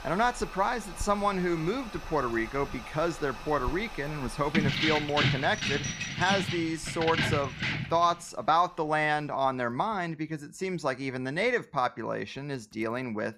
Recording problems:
household noises; noticeable; throughout; 15 dB below the speech
jangling keys; loud; from 4.5 to 8 s; peak 3 dB above the speech

